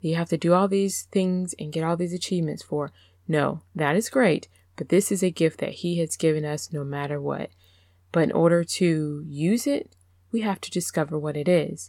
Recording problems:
none

